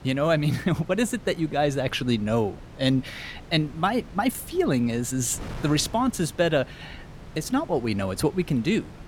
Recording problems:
wind noise on the microphone; occasional gusts; 20 dB below the speech

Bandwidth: 17 kHz